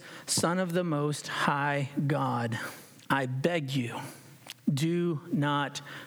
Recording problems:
squashed, flat; heavily

